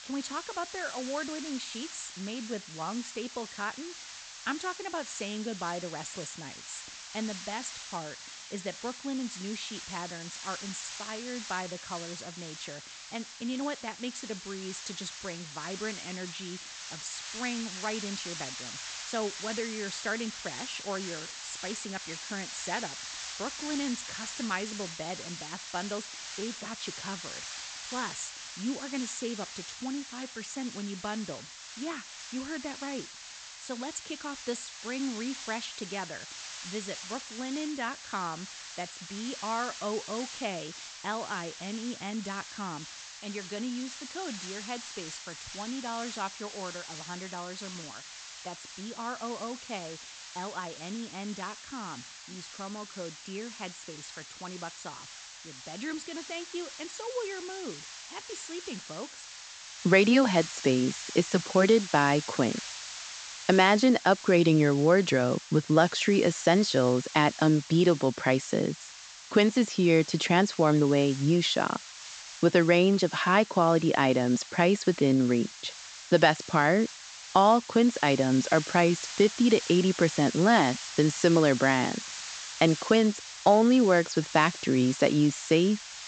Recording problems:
high frequencies cut off; noticeable; nothing above 8 kHz
hiss; noticeable; throughout; 15 dB below the speech

